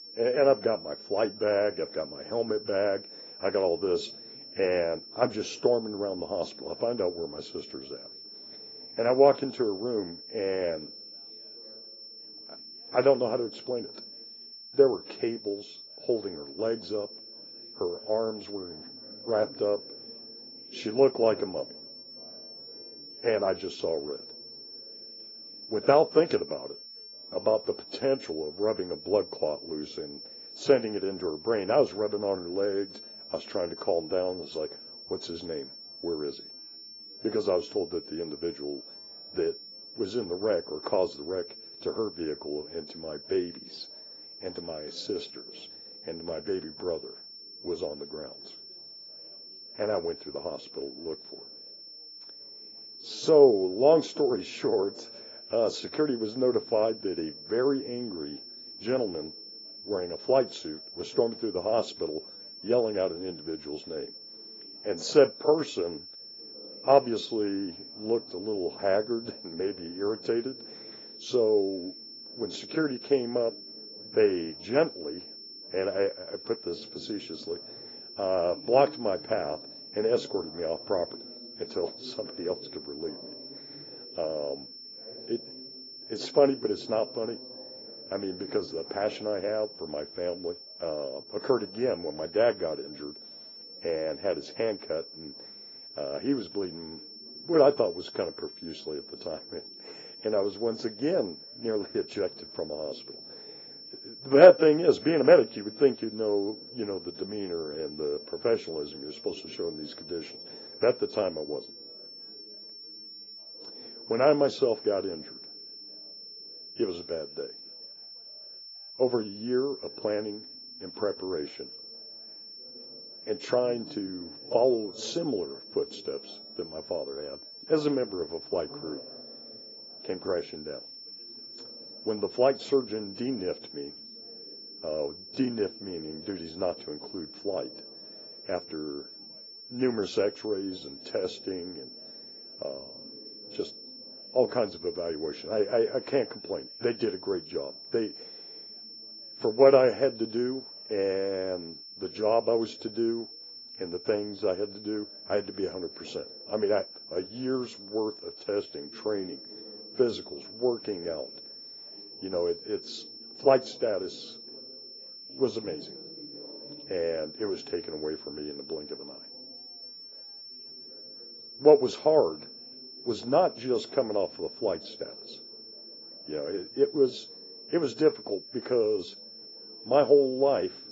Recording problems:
garbled, watery; badly; nothing above 7.5 kHz
muffled; very slightly; fading above 1 kHz
thin; very slightly; fading below 450 Hz
high-pitched whine; noticeable; throughout; 5.5 kHz, 15 dB below the speech
background chatter; faint; throughout; 3 voices, 25 dB below the speech

